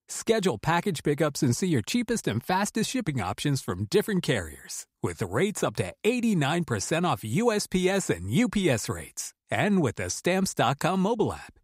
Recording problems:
none

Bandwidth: 15.5 kHz